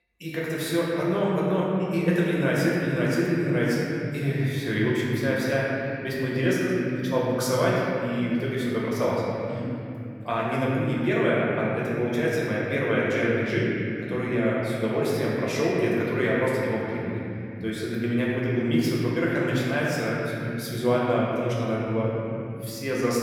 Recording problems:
room echo; strong; dies away in 3 s
off-mic speech; far

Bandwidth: 17 kHz